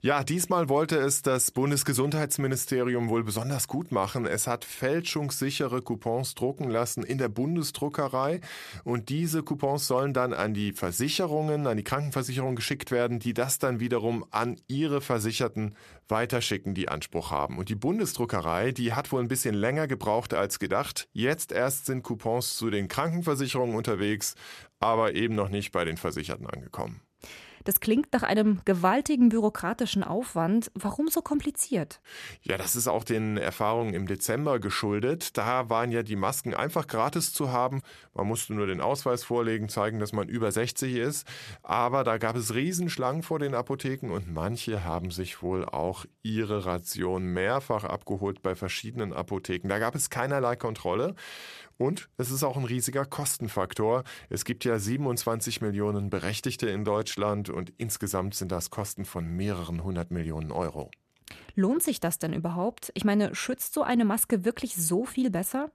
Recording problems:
none

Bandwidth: 14 kHz